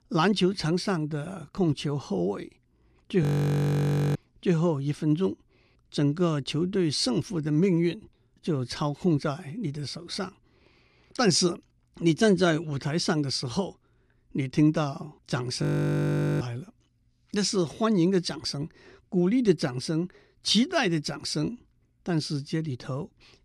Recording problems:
audio freezing; at 3 s for 1 s and at 16 s for 1 s

